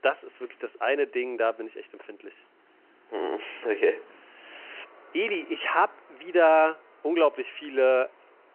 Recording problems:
phone-call audio
traffic noise; faint; throughout; 30 dB below the speech

